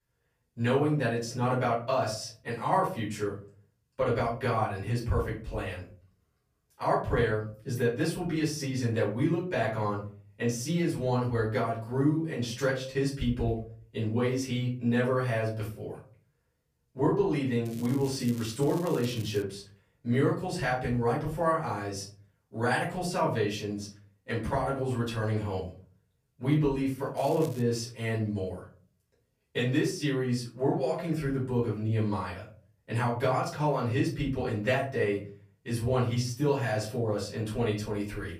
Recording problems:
off-mic speech; far
room echo; slight; dies away in 0.4 s
crackling; noticeable; from 18 to 19 s and at 27 s; 20 dB below the speech

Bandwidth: 15 kHz